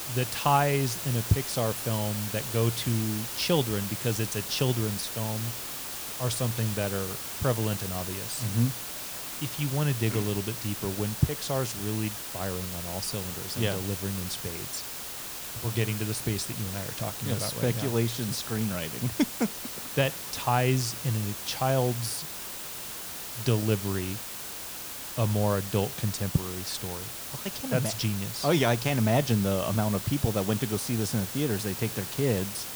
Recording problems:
hiss; loud; throughout; 5 dB below the speech

